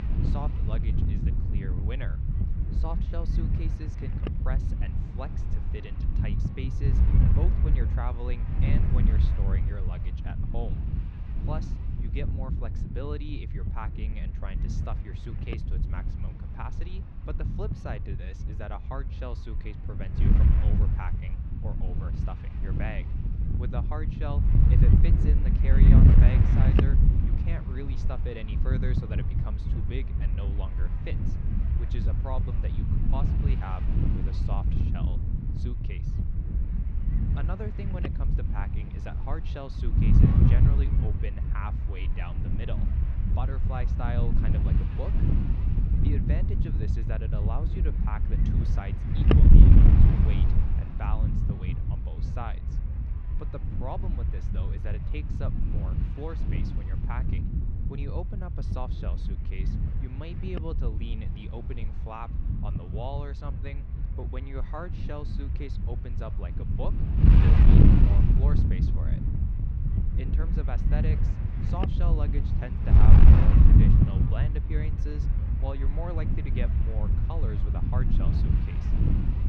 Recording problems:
muffled; slightly; fading above 3 kHz
wind noise on the microphone; heavy; 3 dB above the speech

